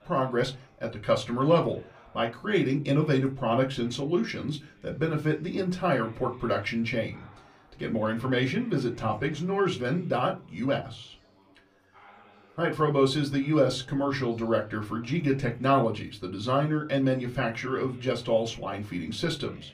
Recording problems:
room echo; very slight; dies away in 0.2 s
off-mic speech; somewhat distant
chatter from many people; faint; throughout; 30 dB below the speech

